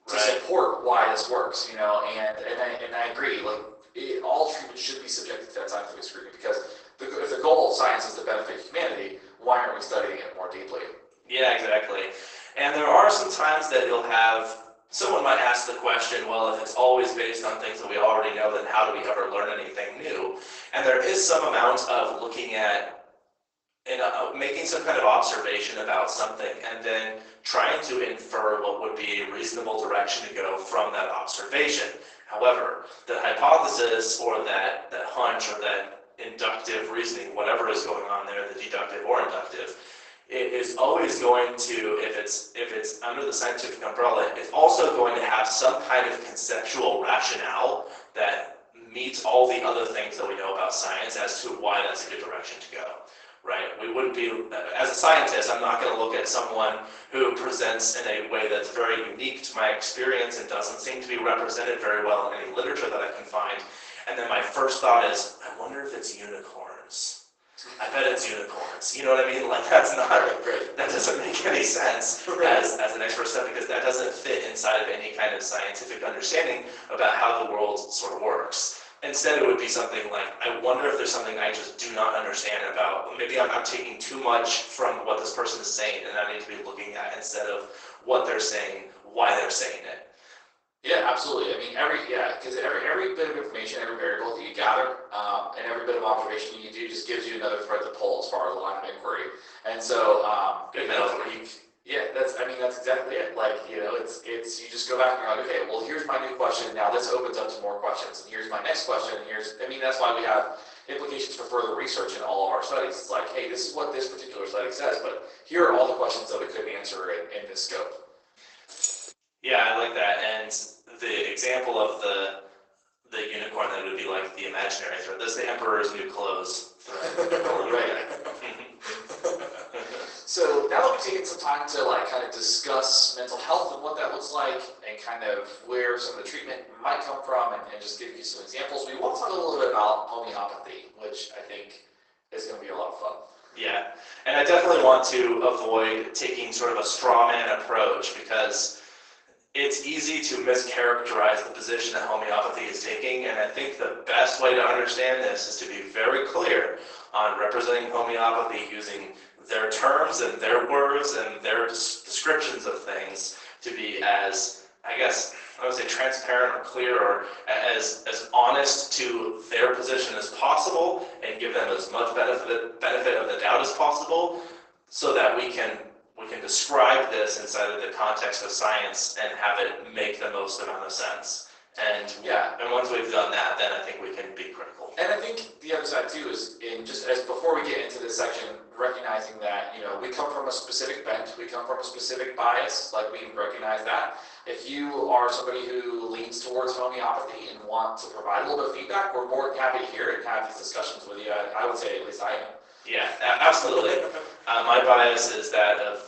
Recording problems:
off-mic speech; far
garbled, watery; badly; nothing above 8 kHz
thin; very; fading below 350 Hz
room echo; noticeable; dies away in 0.8 s
jangling keys; noticeable; at 1:59; peak 2 dB below the speech

